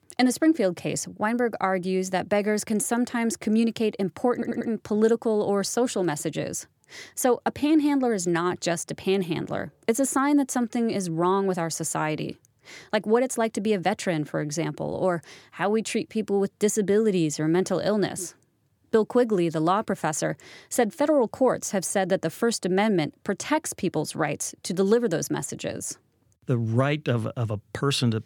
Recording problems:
audio stuttering; at 4.5 s

